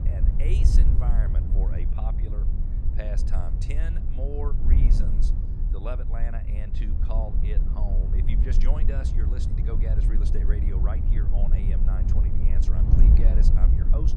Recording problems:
wind noise on the microphone; heavy; 1 dB below the speech

